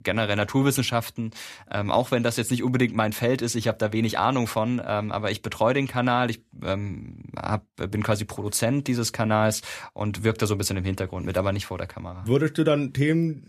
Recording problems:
none

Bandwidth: 14.5 kHz